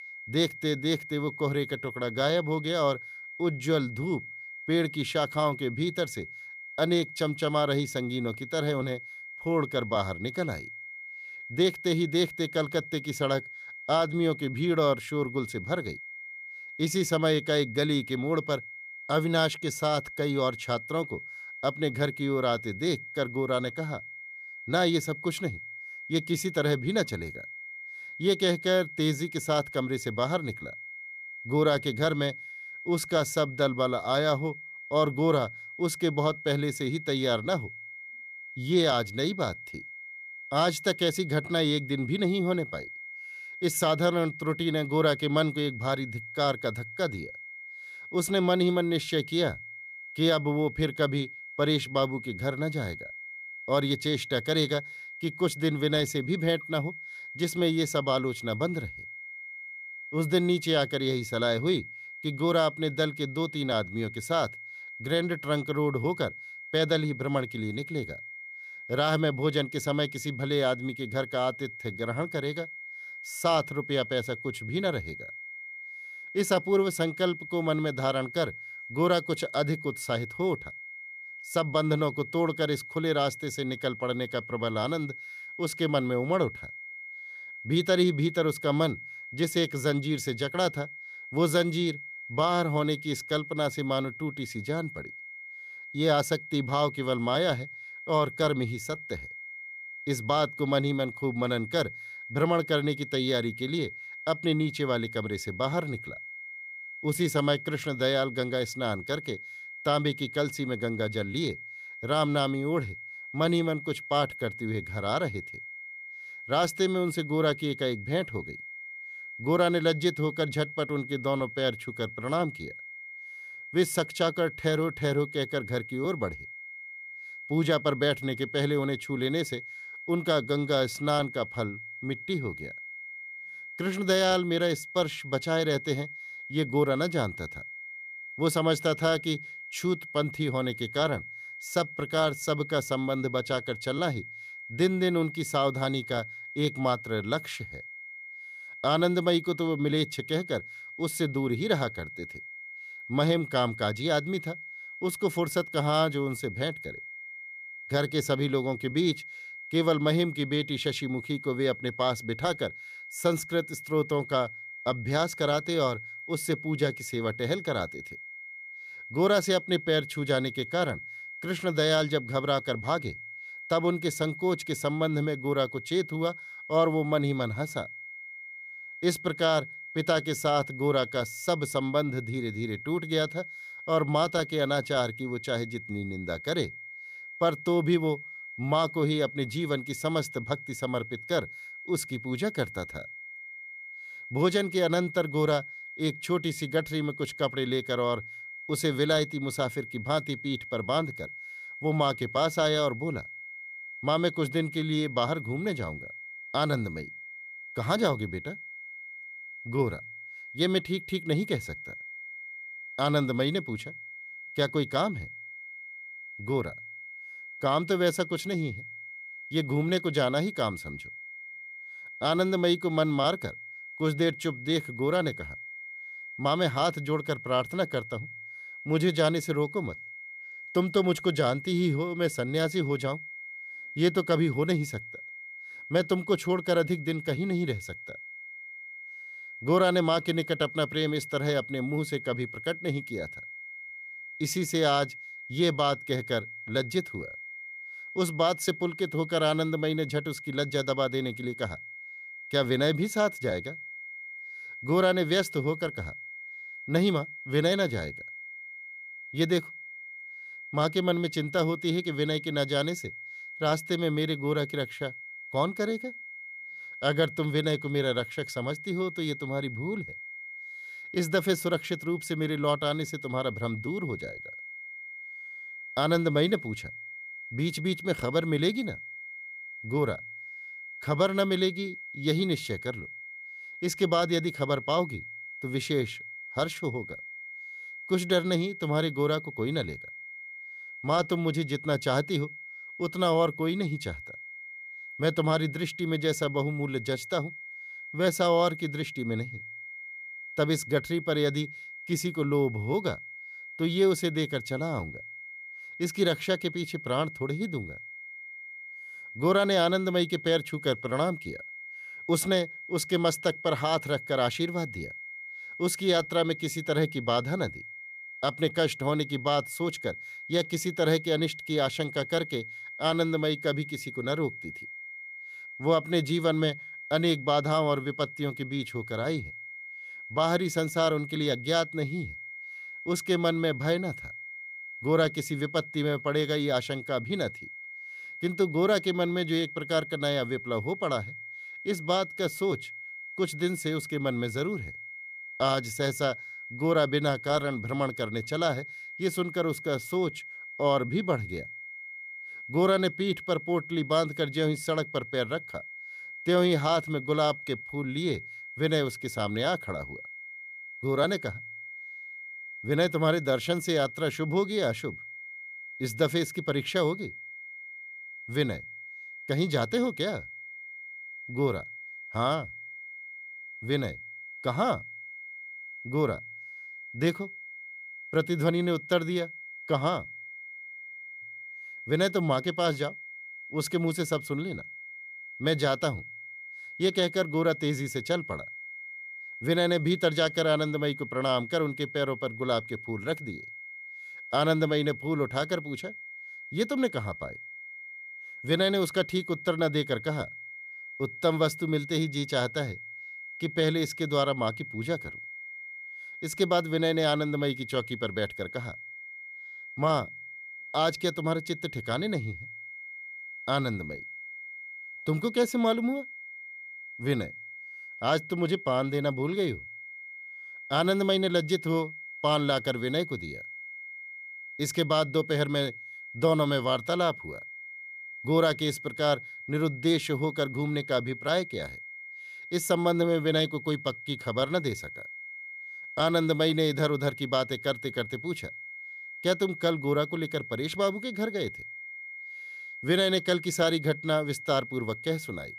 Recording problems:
high-pitched whine; noticeable; throughout; 2 kHz, 10 dB below the speech

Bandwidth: 14.5 kHz